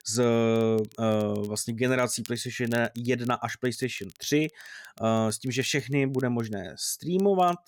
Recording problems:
crackle, like an old record; faint; 25 dB below the speech

